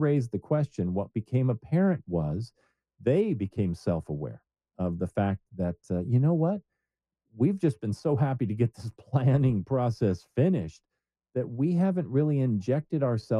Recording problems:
muffled; very; fading above 1 kHz
abrupt cut into speech; at the start and the end

